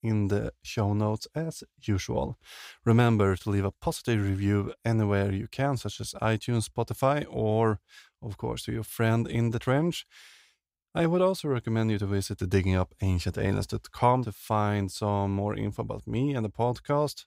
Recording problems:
none

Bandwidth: 15.5 kHz